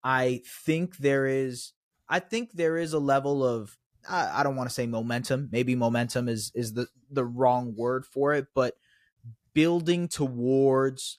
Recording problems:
none

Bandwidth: 14.5 kHz